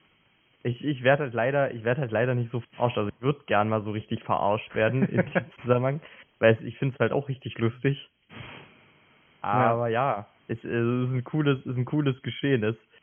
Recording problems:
high frequencies cut off; severe; nothing above 3.5 kHz
hiss; faint; throughout; 25 dB below the speech

